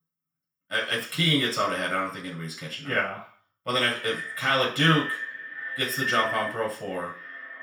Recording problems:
echo of what is said; strong; from 3.5 s on; 530 ms later, 7 dB below the speech
off-mic speech; far
room echo; noticeable; dies away in 0.5 s

